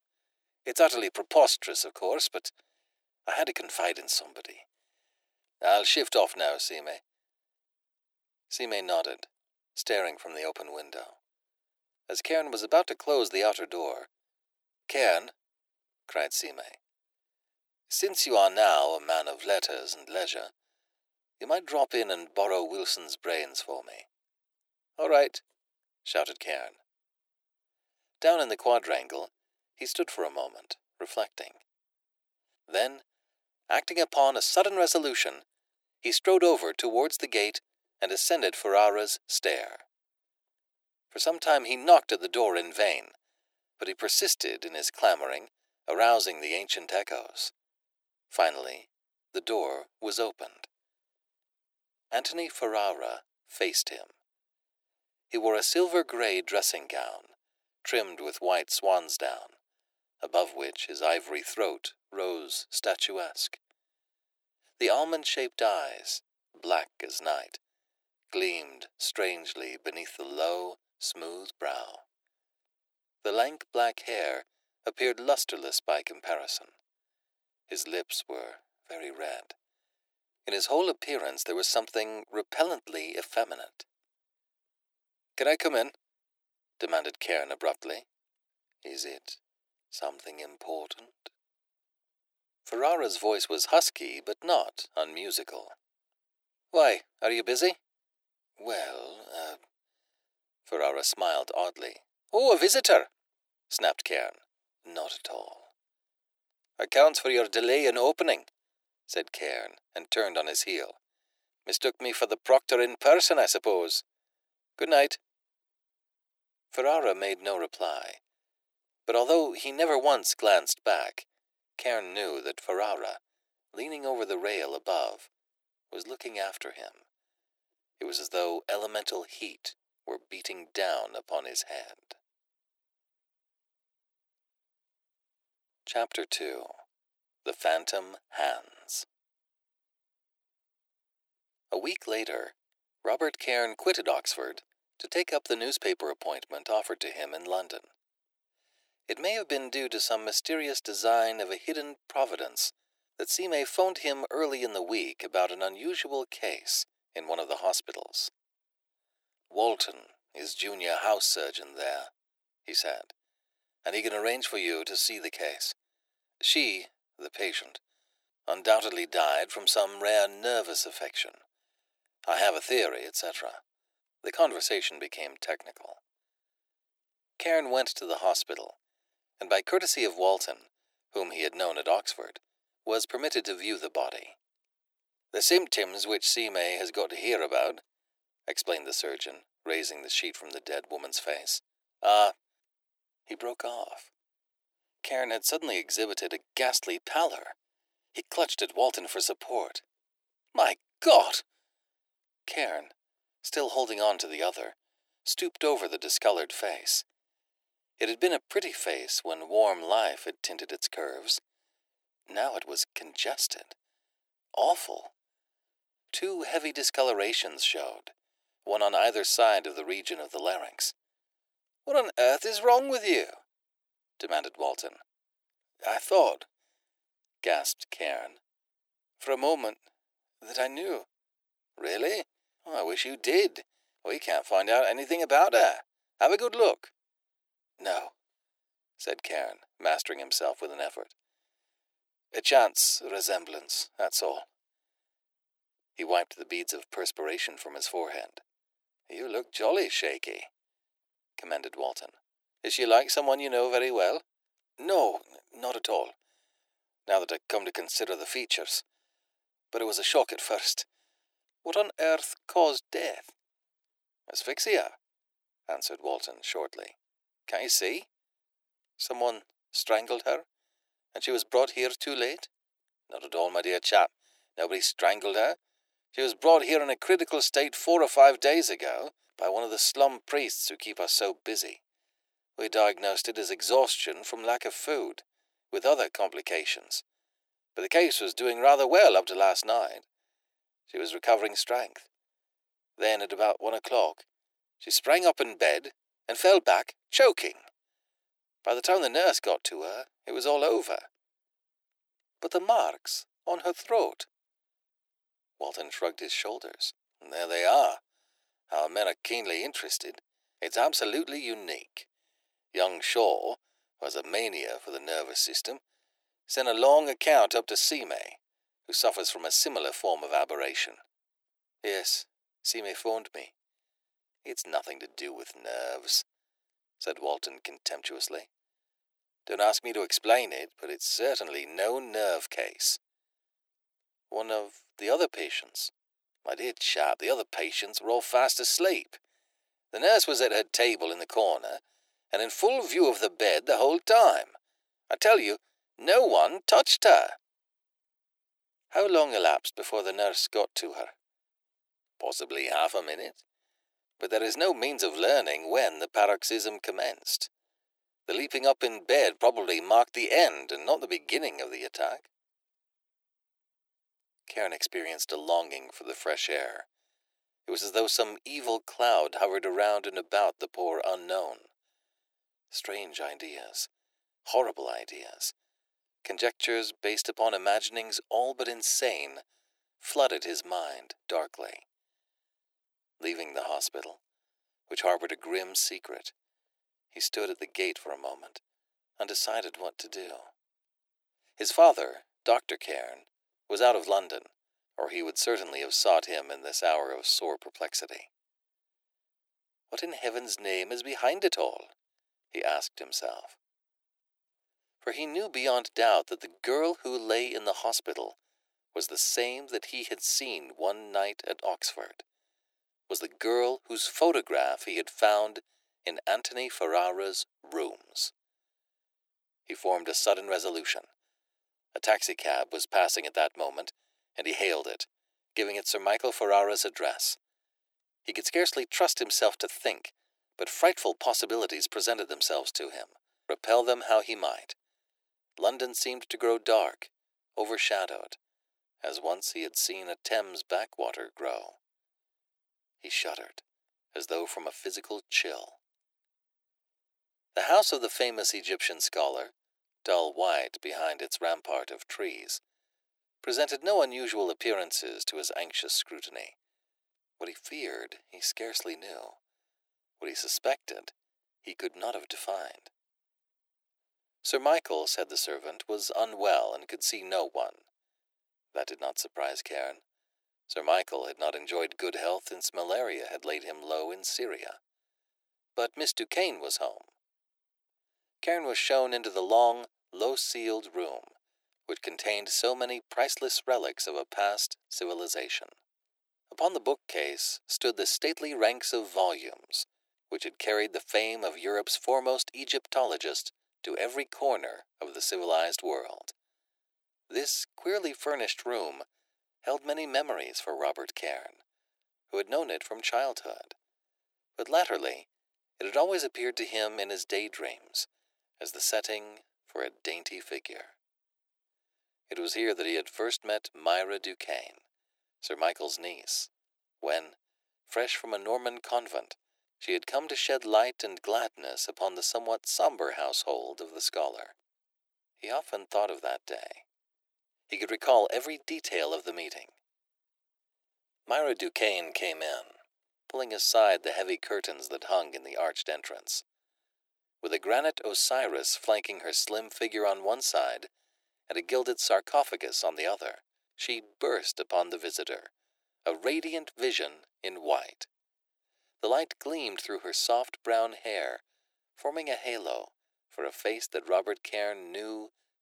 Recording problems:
thin; very; fading below 350 Hz

